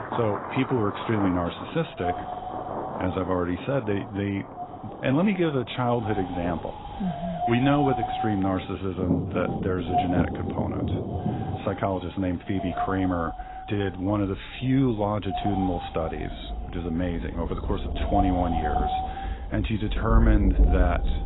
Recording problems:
garbled, watery; badly; nothing above 4 kHz
wind noise on the microphone; heavy; 2 dB below the speech
rain or running water; loud; throughout; 4 dB below the speech

